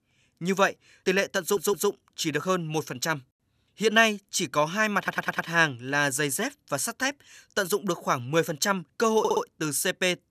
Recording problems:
audio stuttering; at 1.5 s, at 5 s and at 9 s

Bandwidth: 14.5 kHz